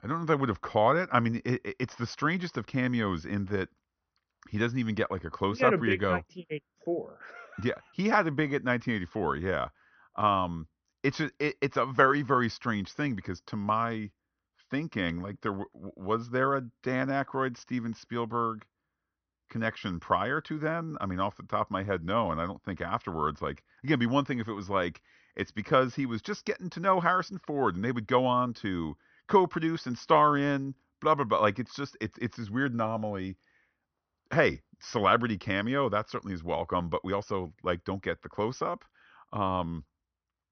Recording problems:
high frequencies cut off; noticeable; nothing above 6 kHz

